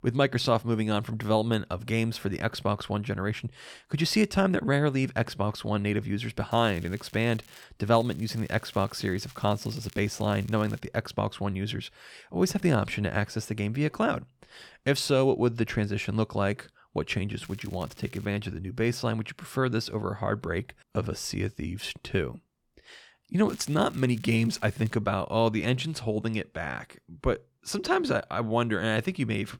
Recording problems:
crackling; faint; 4 times, first at 6.5 s; 25 dB below the speech

